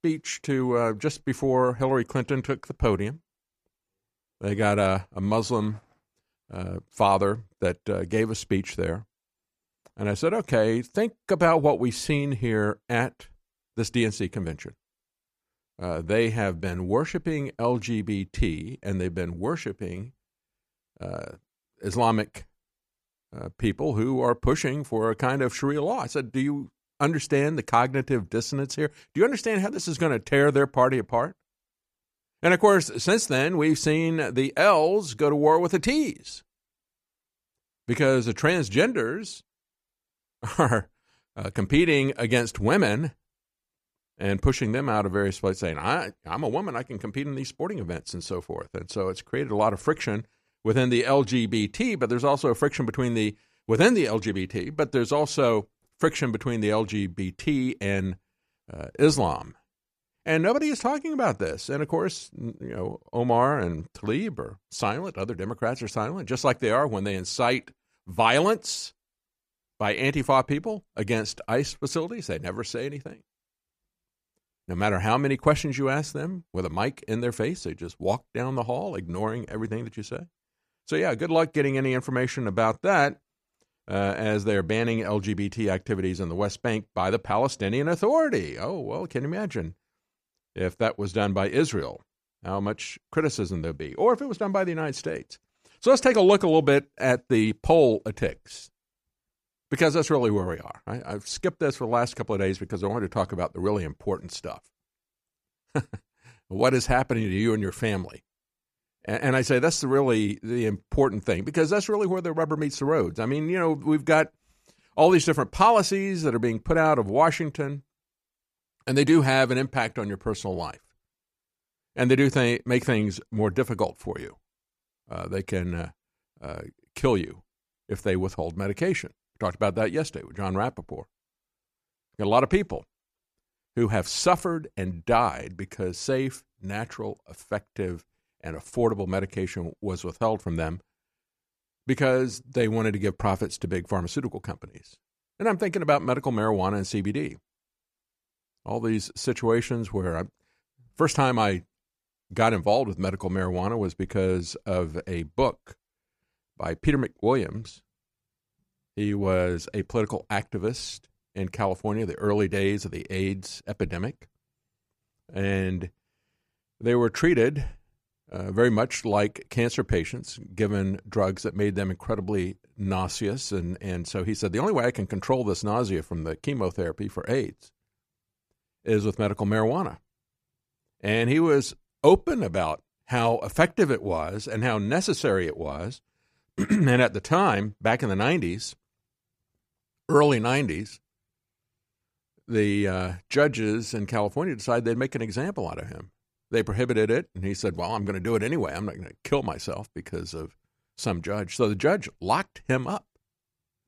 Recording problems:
none

